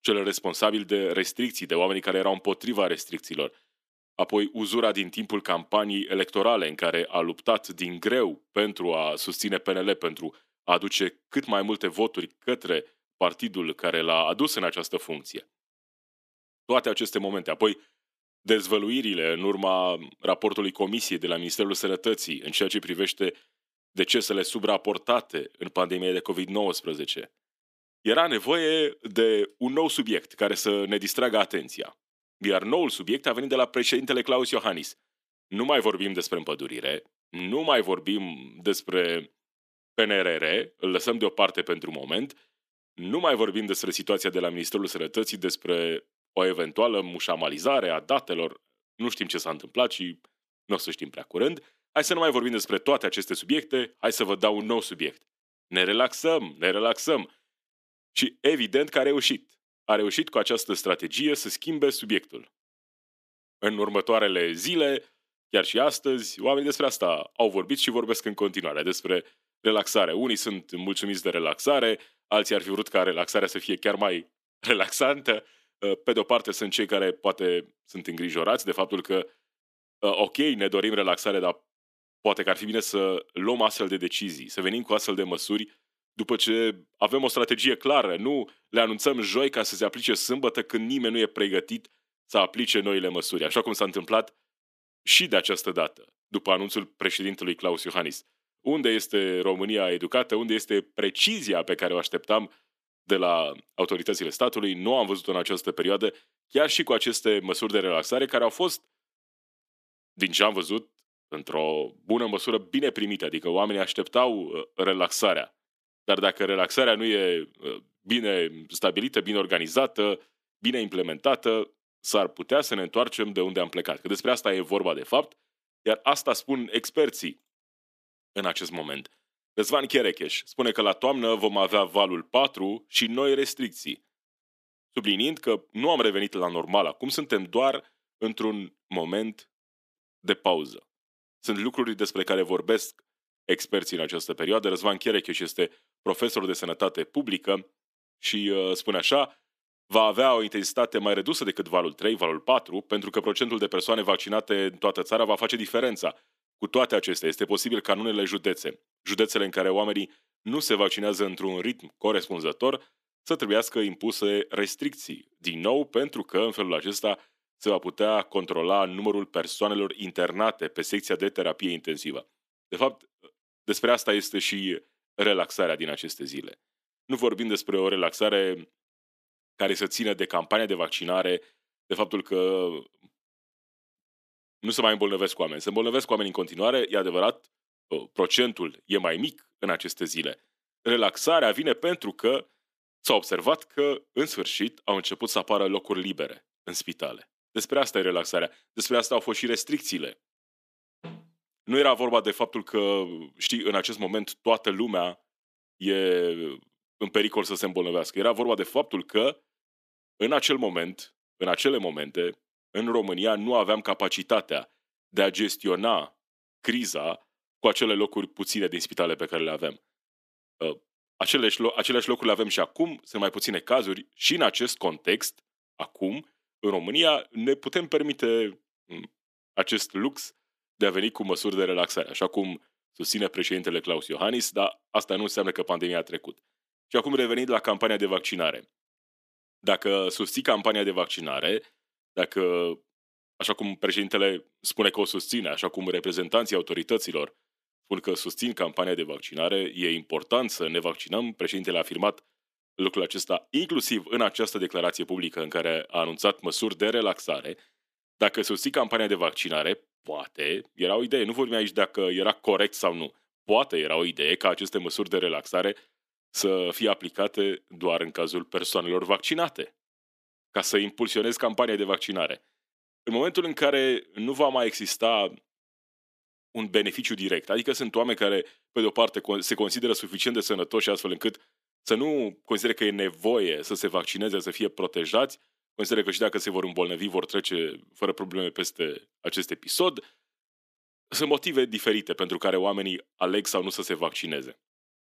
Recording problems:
thin; somewhat; fading below 250 Hz

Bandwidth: 14.5 kHz